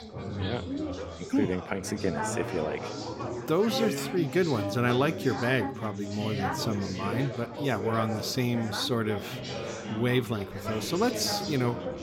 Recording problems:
chatter from many people; loud; throughout; 5 dB below the speech

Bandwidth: 16.5 kHz